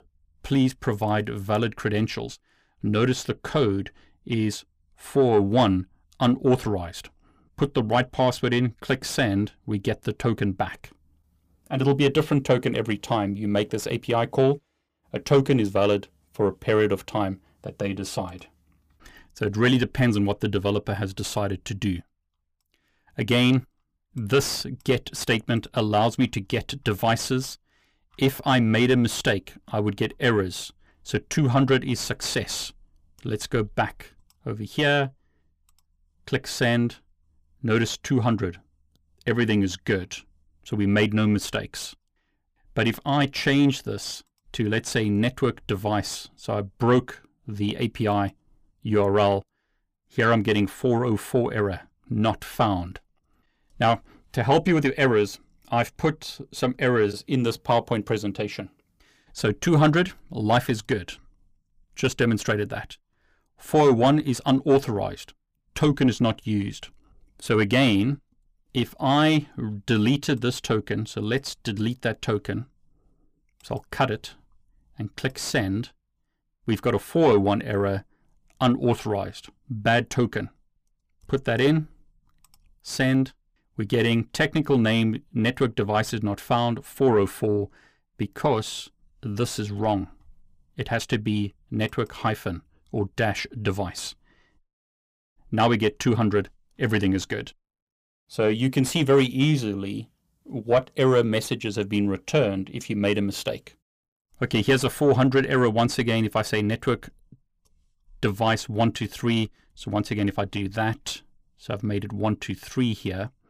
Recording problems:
distortion; slight; 10 dB below the speech

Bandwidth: 15 kHz